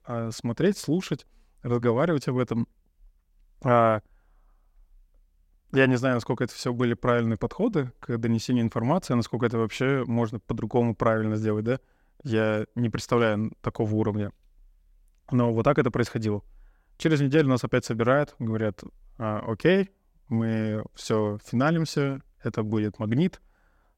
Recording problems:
none

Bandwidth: 16 kHz